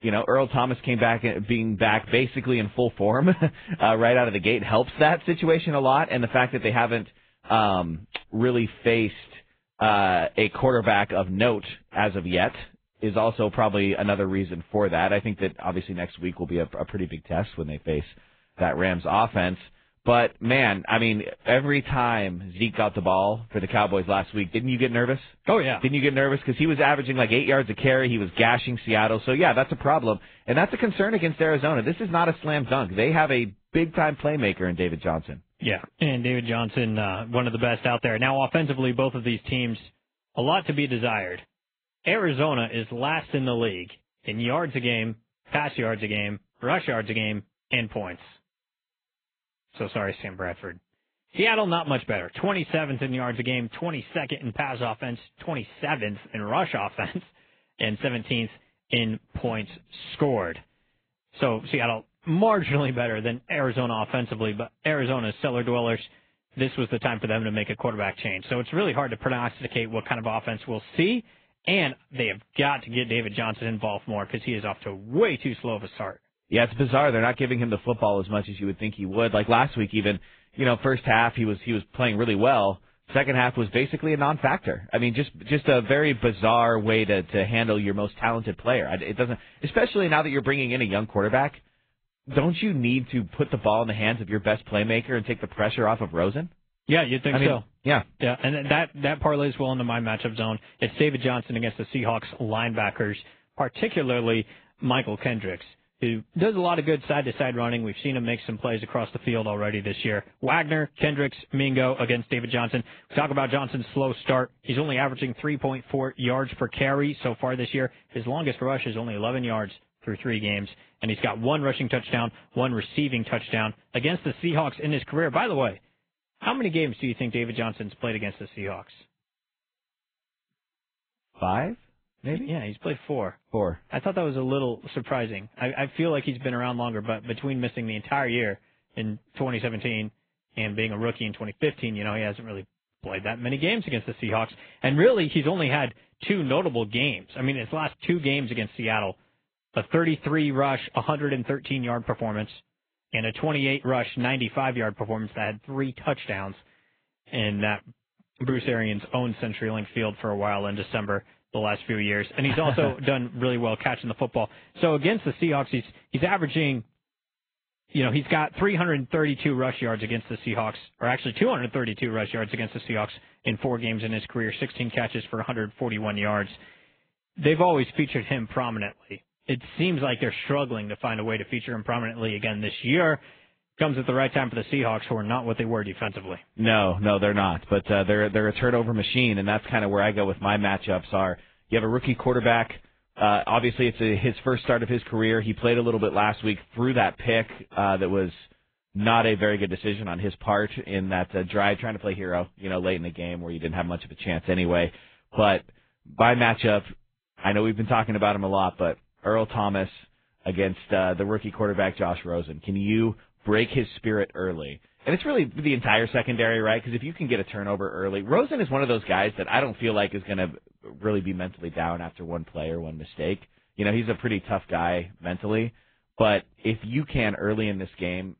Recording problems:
garbled, watery; badly; nothing above 3.5 kHz
high frequencies cut off; slight

